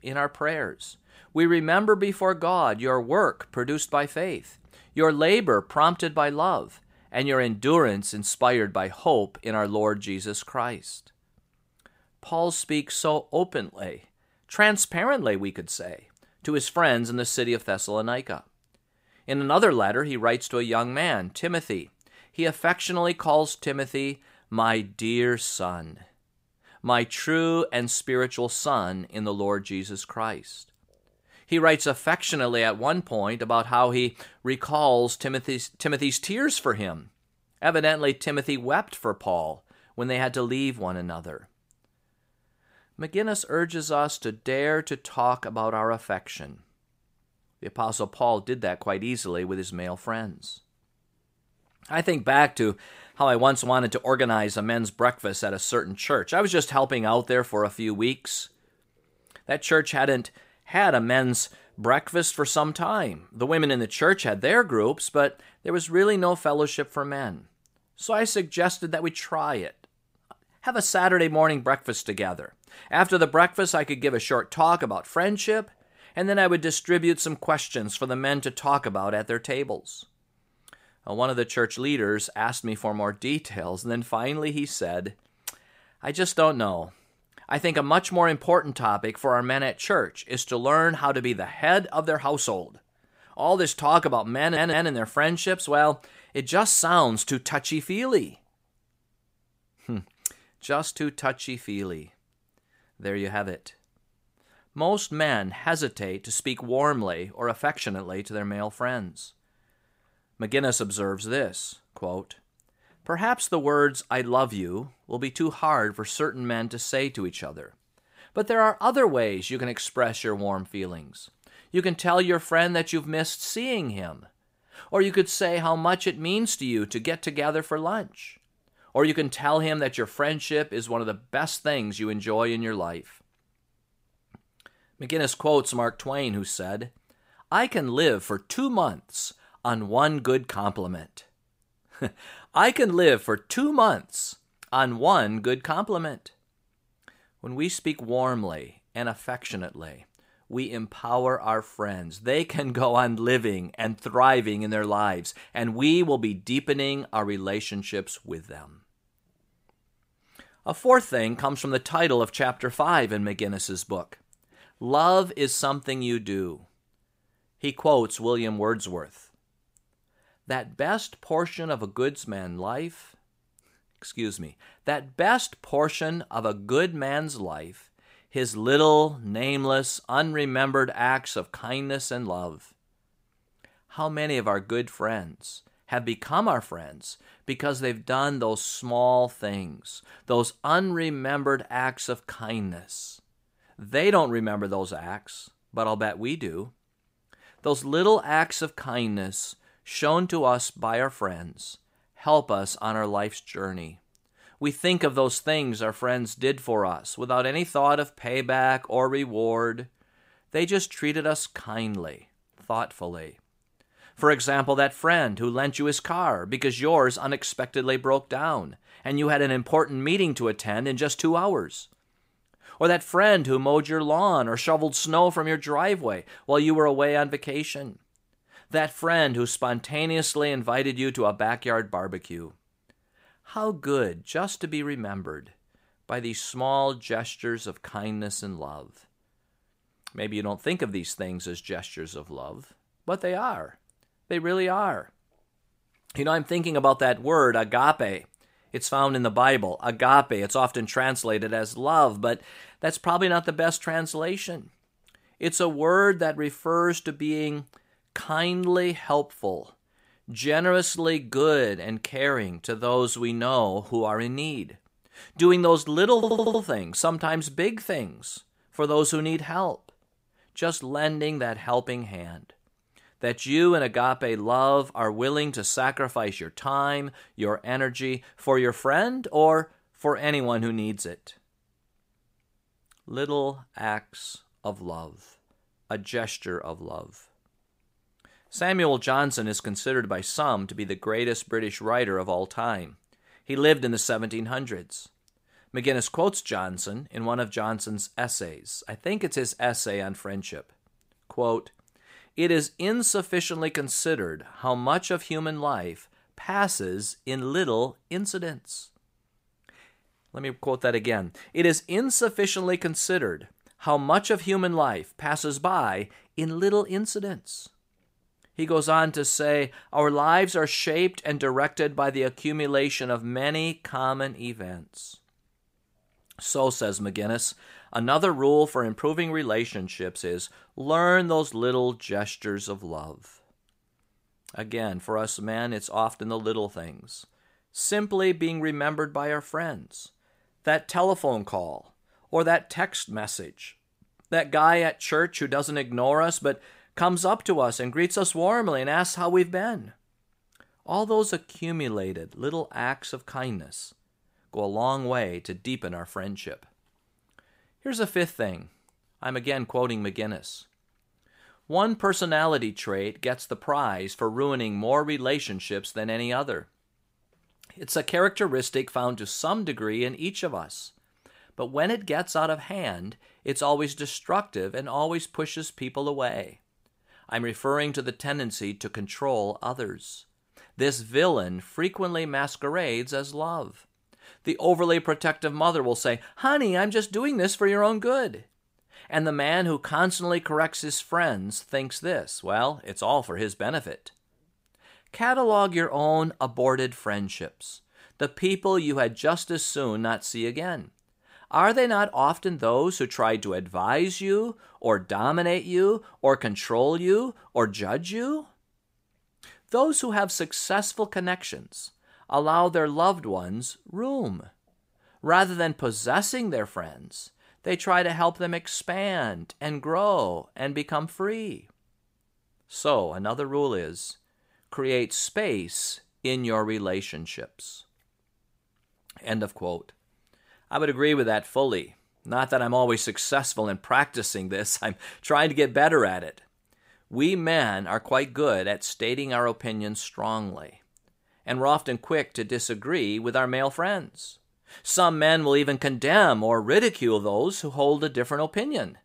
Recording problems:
audio stuttering; at 1:34 and at 4:26

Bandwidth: 15.5 kHz